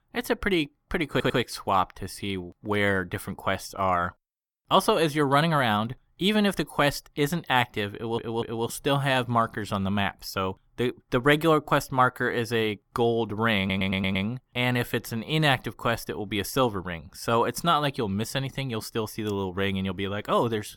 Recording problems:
audio stuttering; at 1 s, at 8 s and at 14 s

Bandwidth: 17.5 kHz